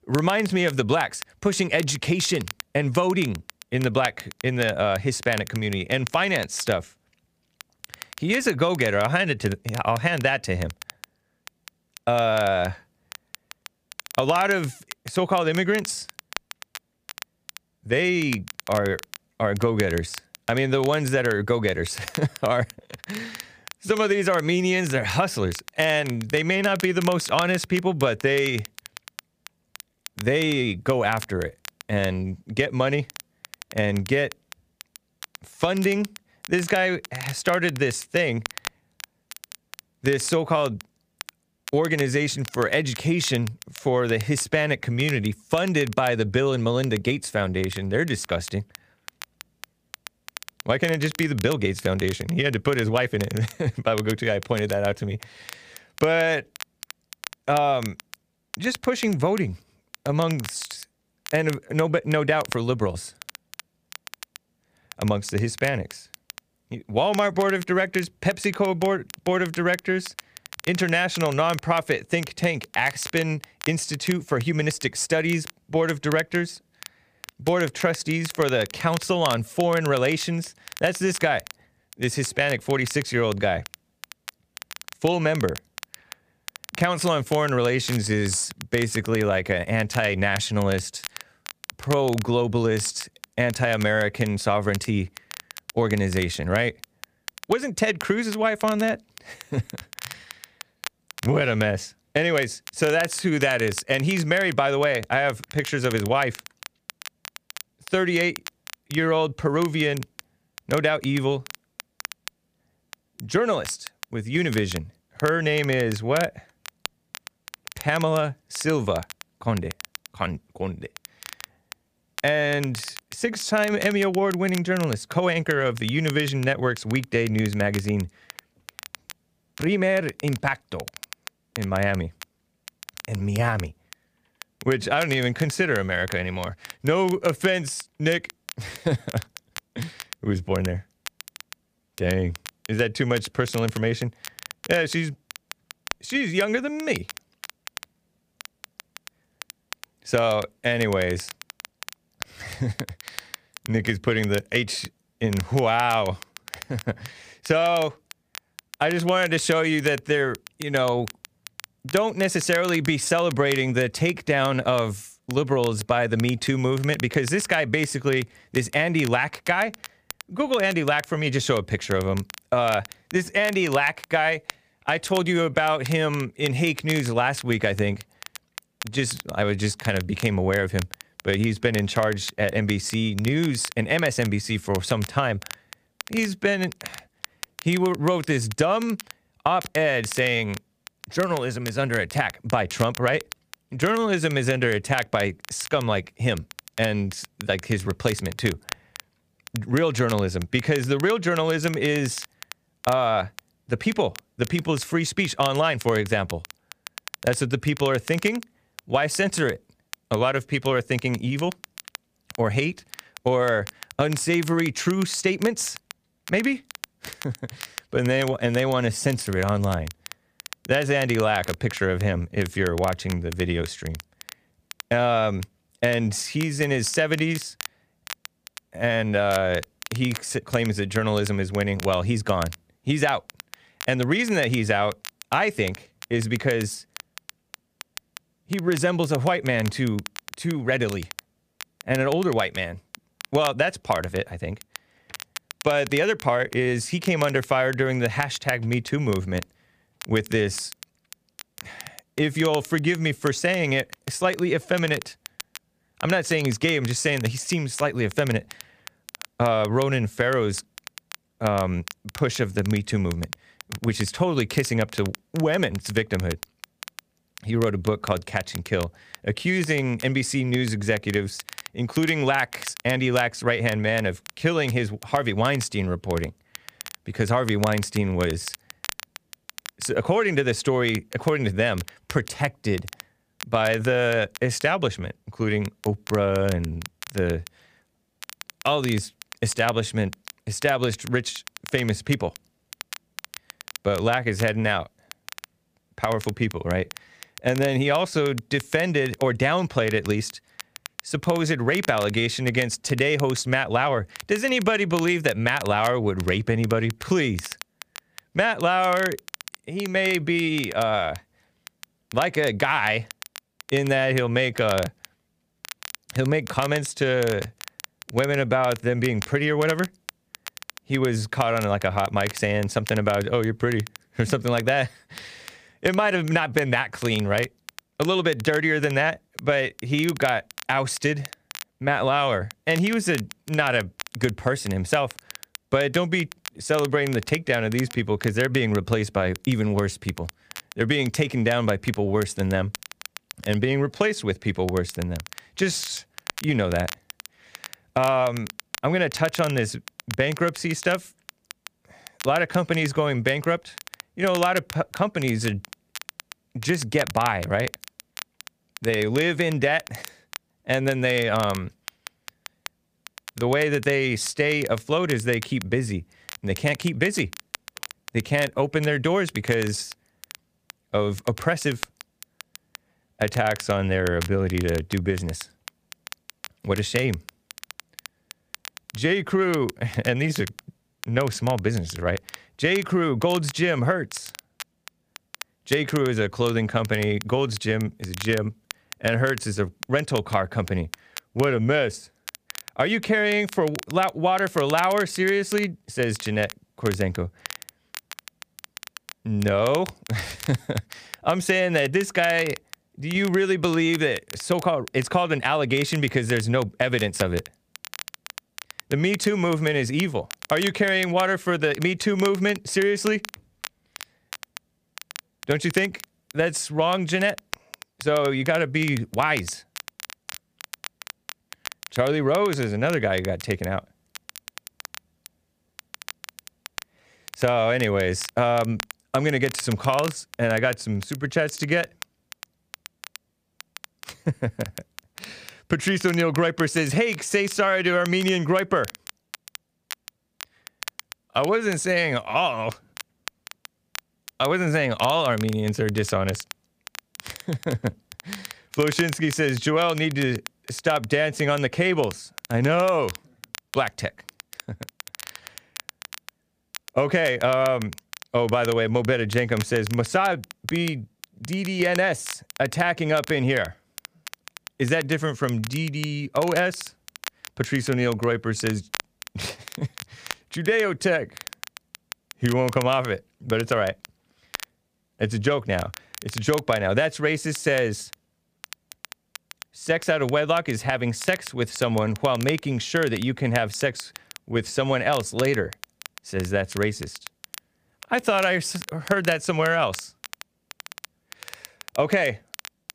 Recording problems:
crackle, like an old record; noticeable; 15 dB below the speech

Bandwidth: 15 kHz